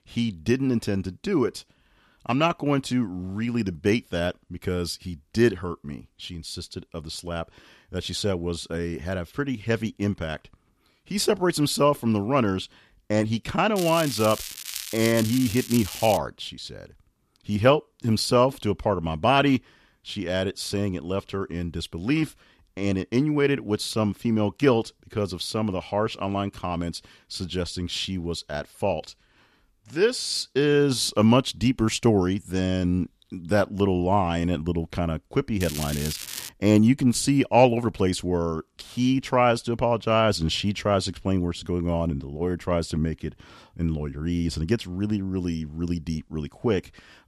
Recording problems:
crackling; loud; from 14 to 16 s and at 36 s; 8 dB below the speech

